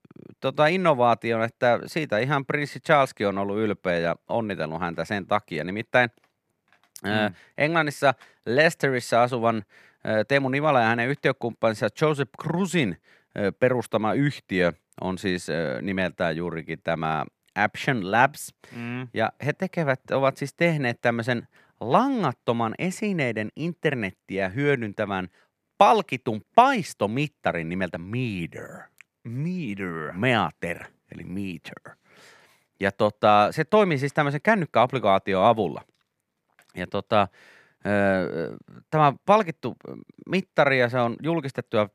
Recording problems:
none

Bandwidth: 14.5 kHz